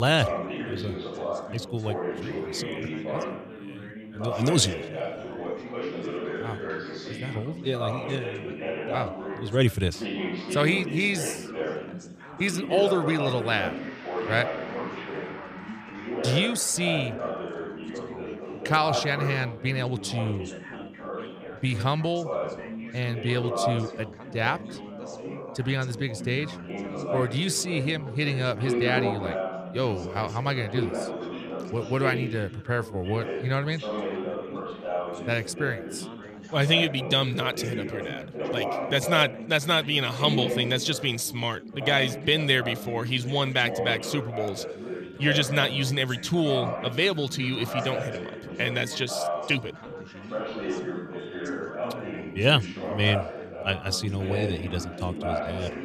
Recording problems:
background chatter; loud; throughout; 4 voices, 7 dB below the speech
background music; faint; from 14 s on; 25 dB below the speech
abrupt cut into speech; at the start

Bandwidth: 14.5 kHz